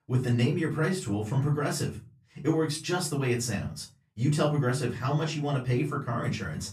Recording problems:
off-mic speech; far
room echo; very slight; dies away in 0.3 s

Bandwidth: 14.5 kHz